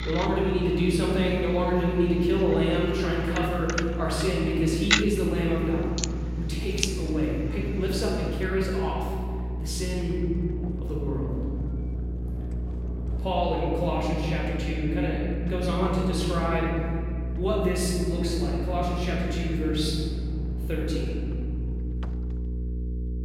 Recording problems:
room echo; strong; dies away in 2.5 s
off-mic speech; far
household noises; loud; throughout; 9 dB below the speech
electrical hum; noticeable; throughout; 60 Hz, 15 dB below the speech

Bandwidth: 16.5 kHz